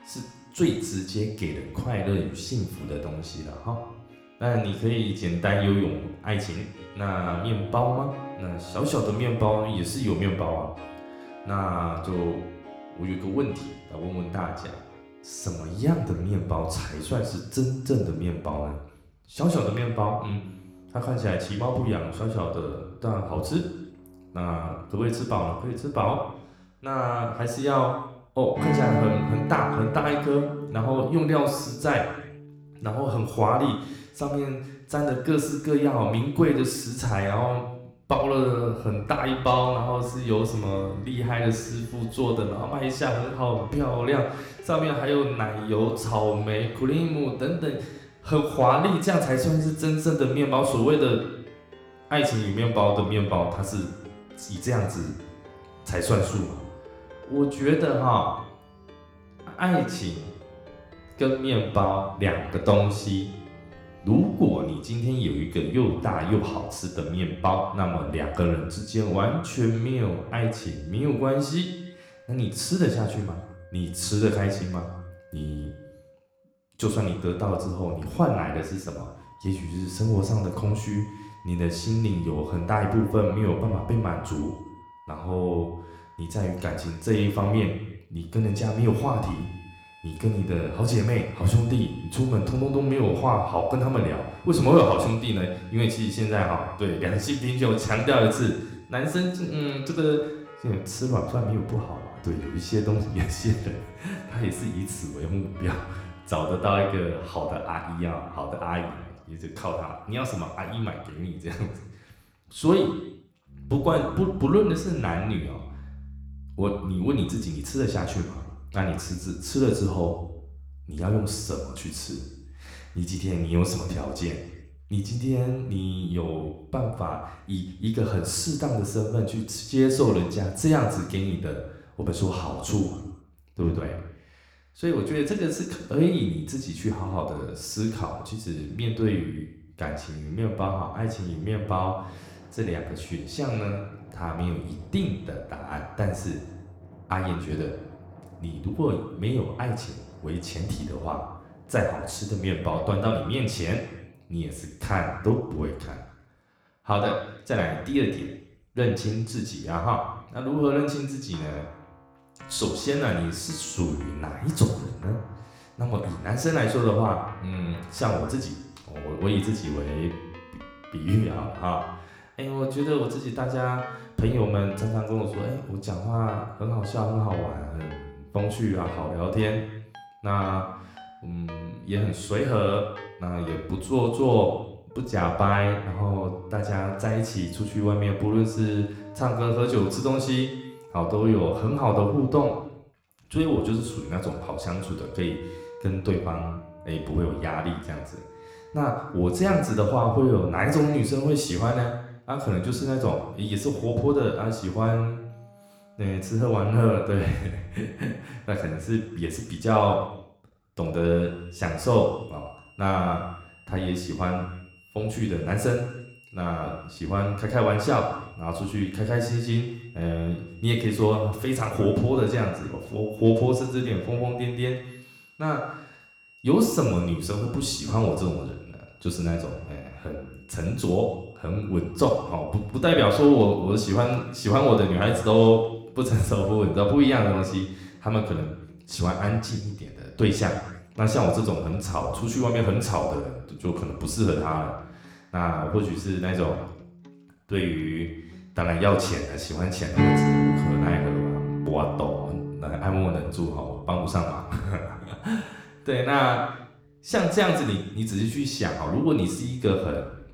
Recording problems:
room echo; slight; dies away in 0.8 s
off-mic speech; somewhat distant
background music; noticeable; throughout; 15 dB below the speech

